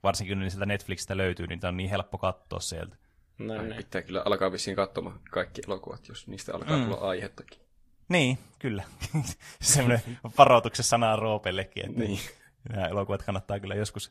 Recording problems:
garbled, watery; slightly; nothing above 14.5 kHz

